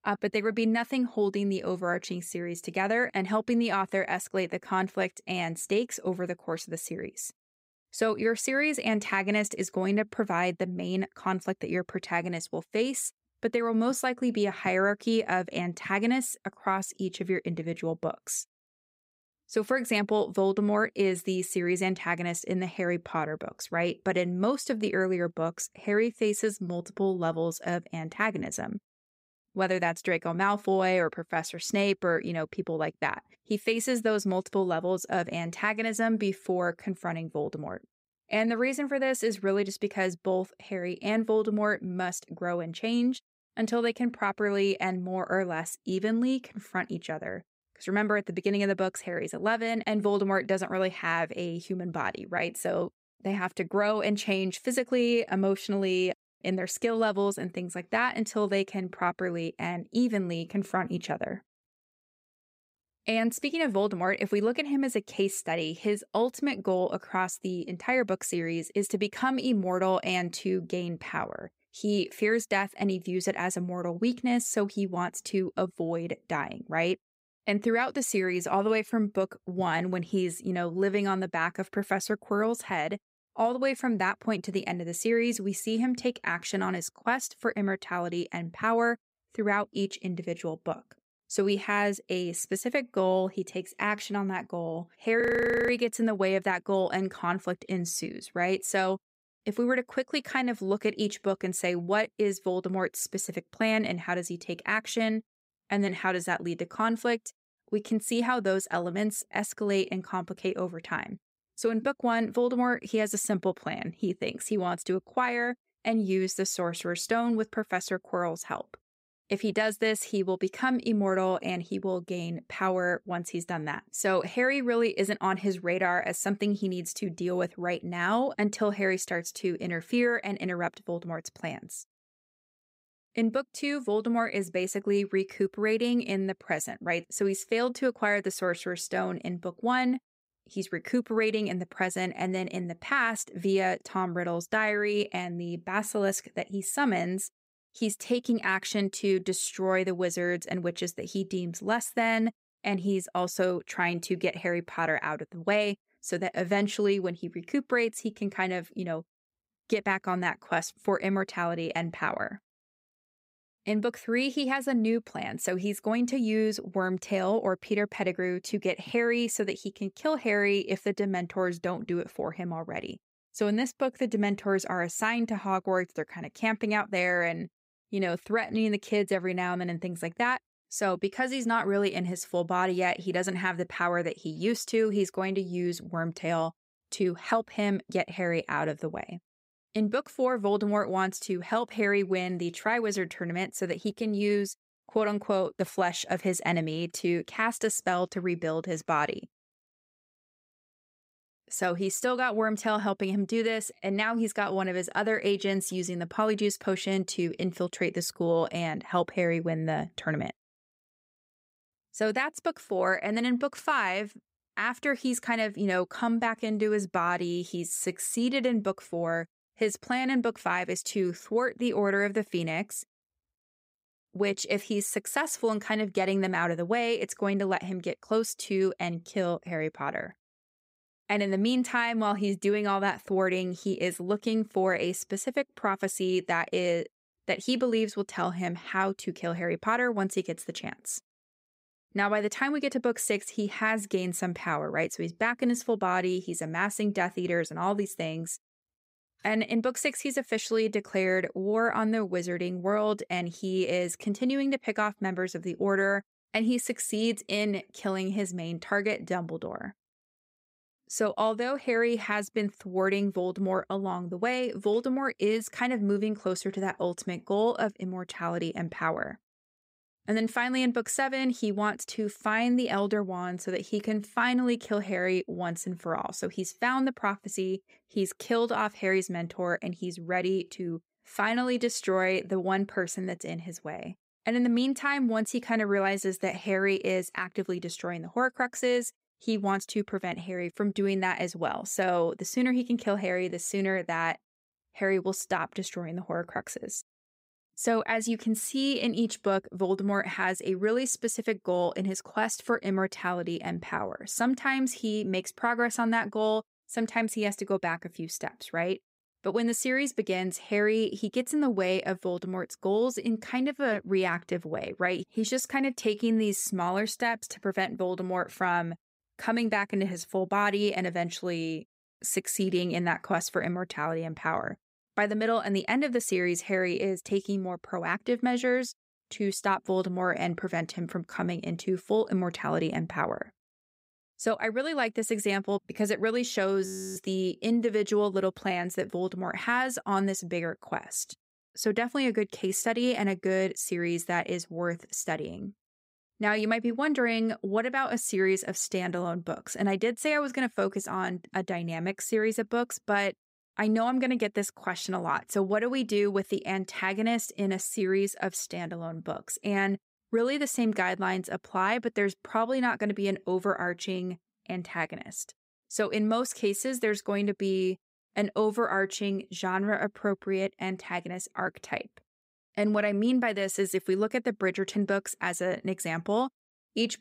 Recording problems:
audio freezing; at 1:35 and at 5:37

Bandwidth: 15.5 kHz